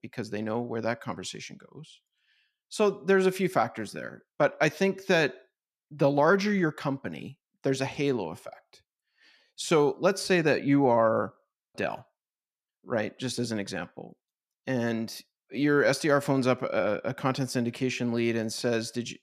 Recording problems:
none

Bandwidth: 14.5 kHz